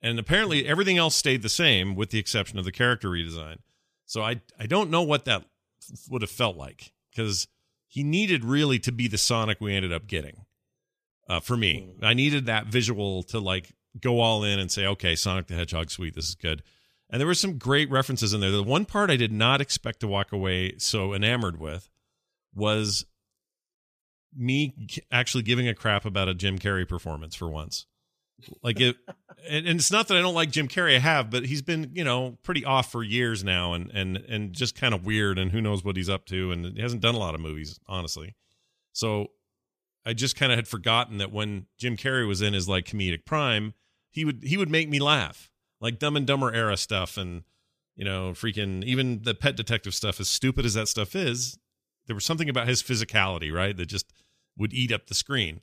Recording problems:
none

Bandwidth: 14.5 kHz